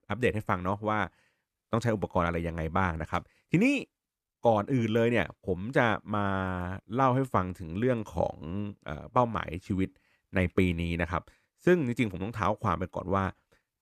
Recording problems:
none

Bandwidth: 14.5 kHz